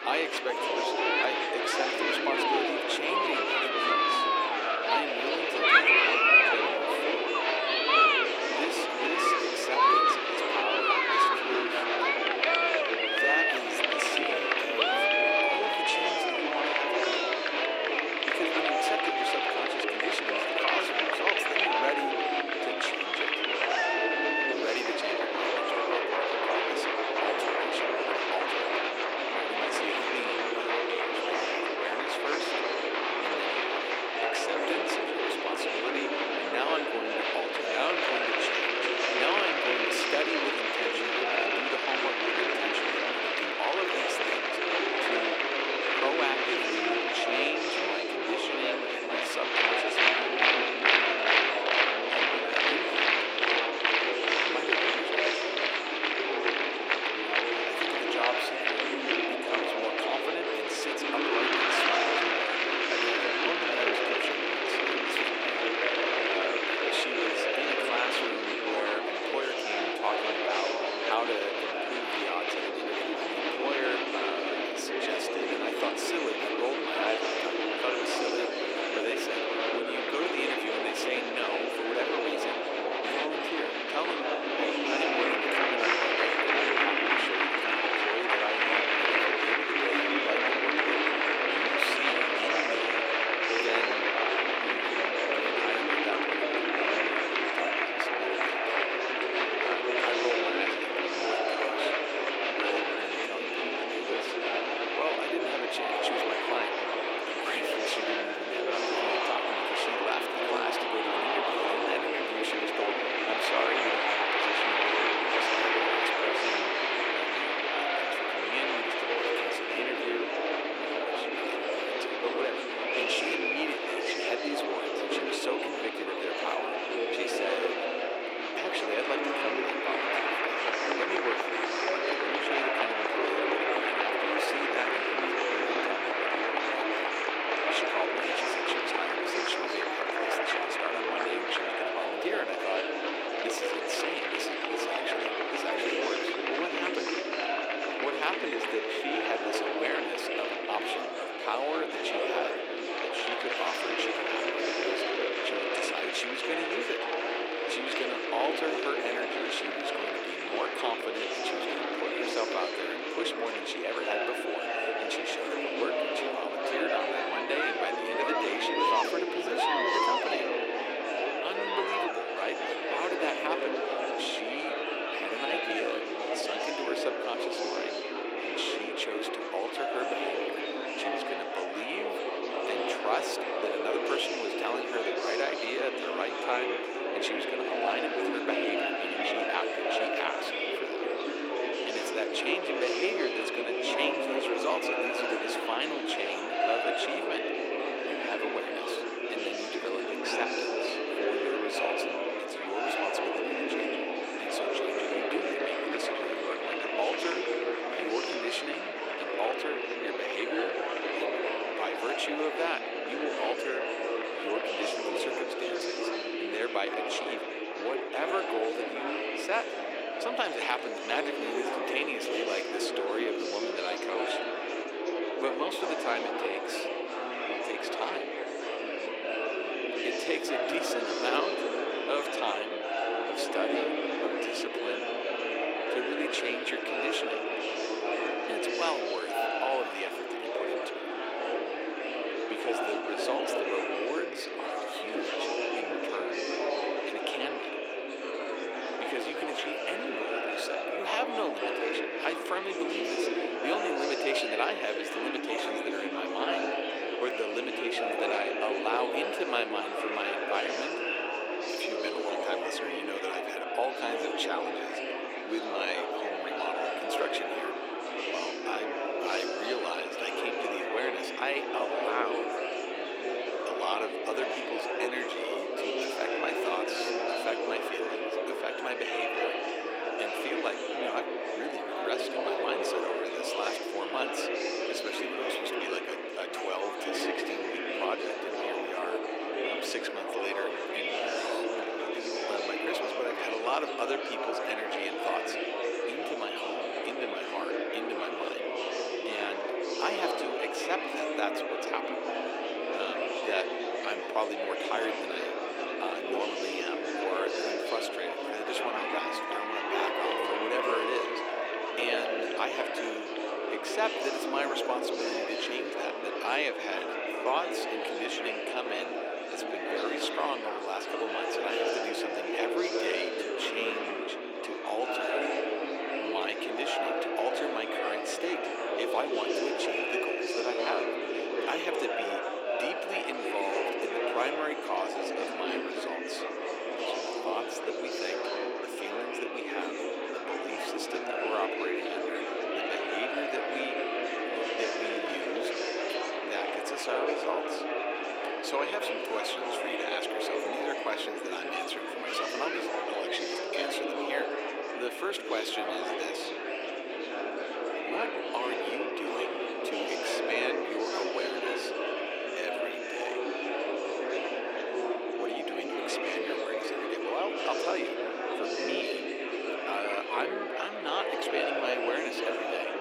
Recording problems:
thin; very; fading below 350 Hz
murmuring crowd; very loud; throughout; 6 dB above the speech

